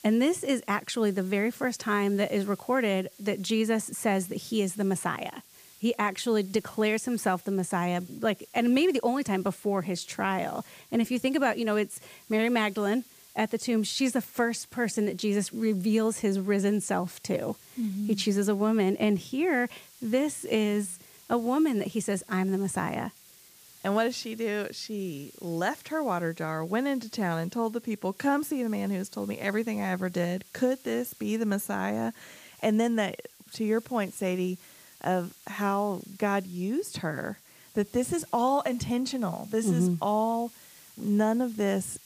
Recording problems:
hiss; faint; throughout; 25 dB below the speech

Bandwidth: 15 kHz